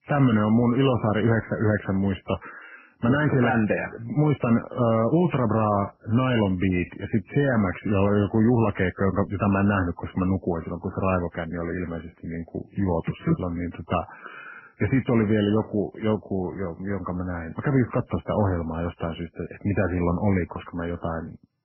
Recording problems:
garbled, watery; badly; nothing above 3 kHz

